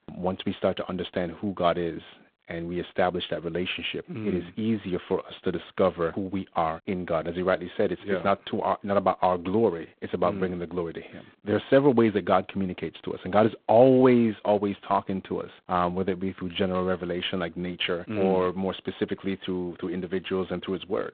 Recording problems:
phone-call audio; poor line

